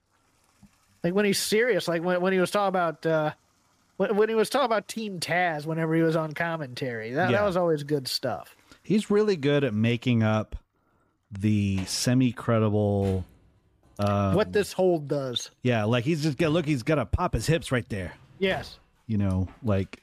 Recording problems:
household noises; faint; throughout; 25 dB below the speech

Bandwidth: 15 kHz